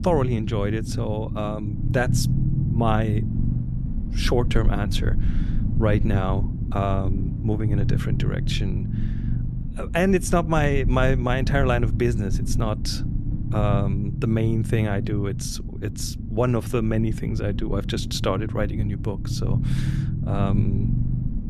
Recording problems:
low rumble; loud; throughout; 10 dB below the speech

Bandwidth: 13.5 kHz